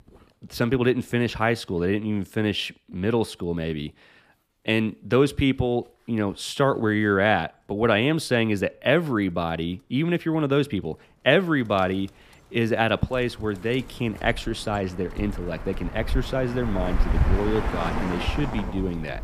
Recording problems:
animal sounds; loud; throughout; 7 dB below the speech

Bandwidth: 15 kHz